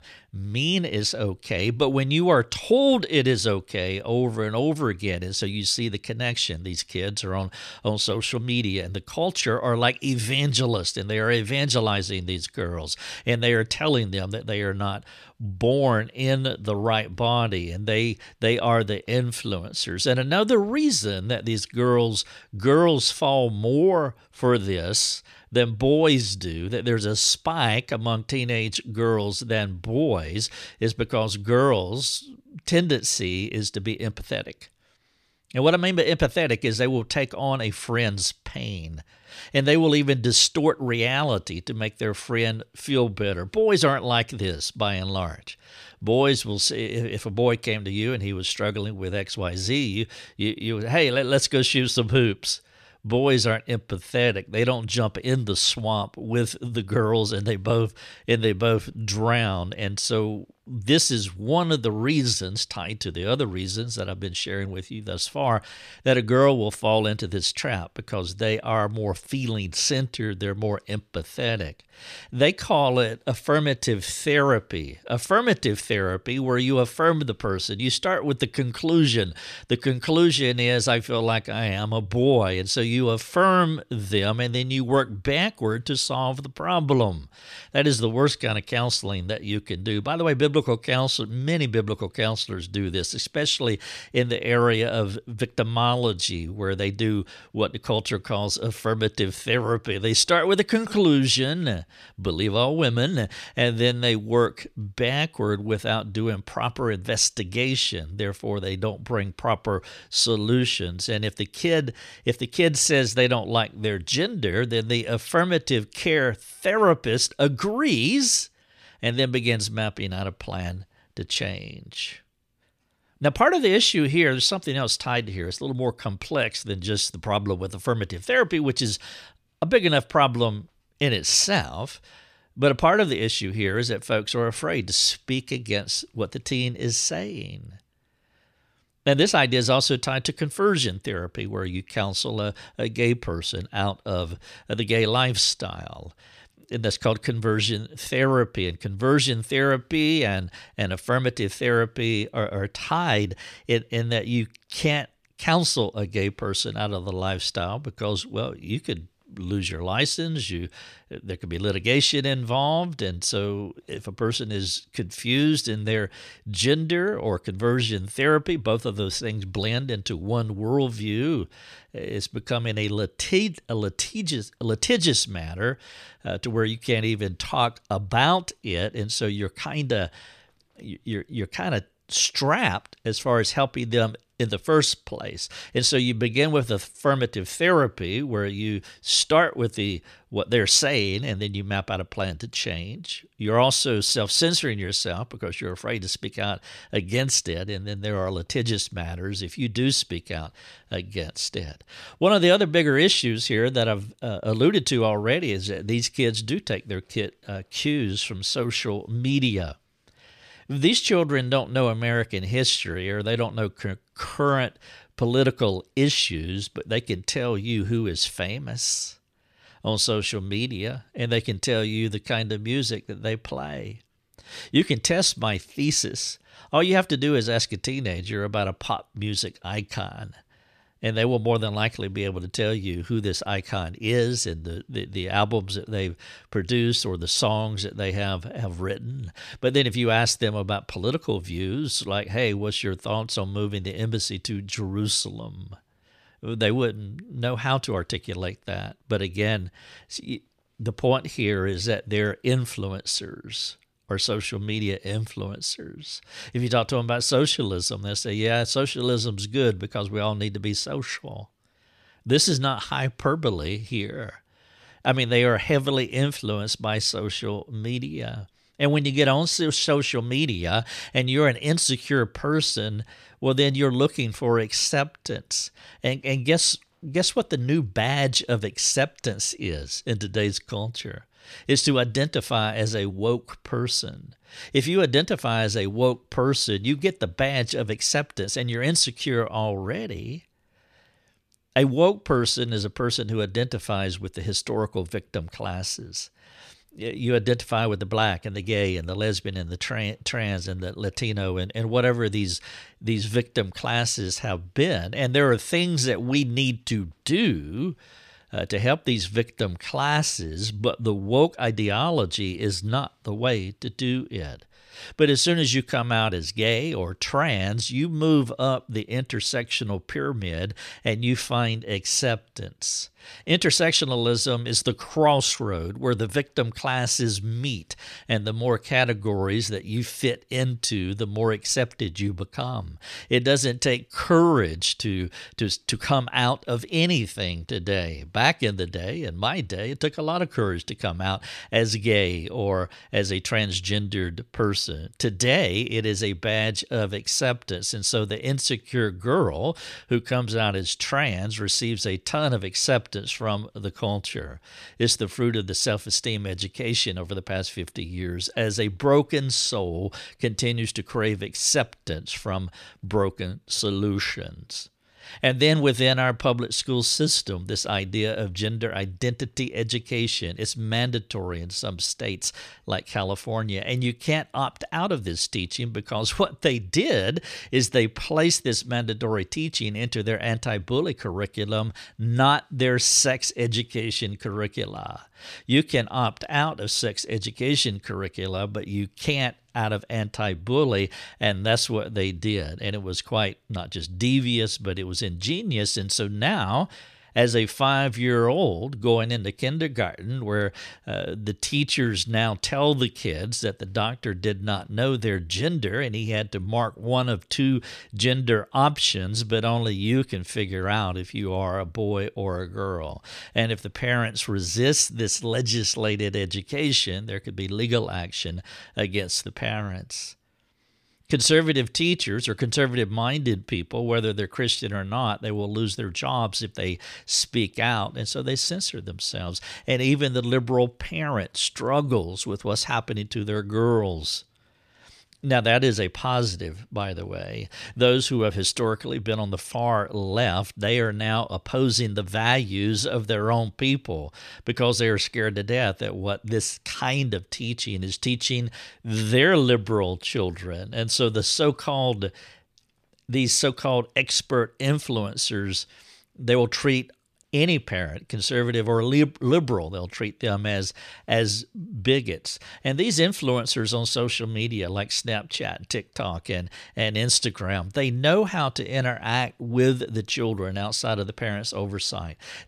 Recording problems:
none

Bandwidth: 14.5 kHz